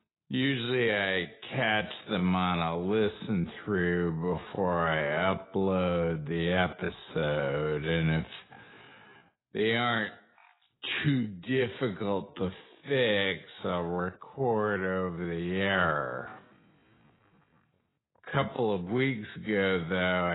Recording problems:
garbled, watery; badly; nothing above 4 kHz
wrong speed, natural pitch; too slow; 0.5 times normal speed
abrupt cut into speech; at the end

